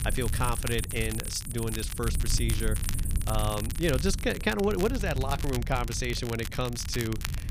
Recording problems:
animal sounds; loud; throughout; 8 dB below the speech
low rumble; noticeable; throughout; 20 dB below the speech
crackle, like an old record; noticeable; 10 dB below the speech

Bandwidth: 15 kHz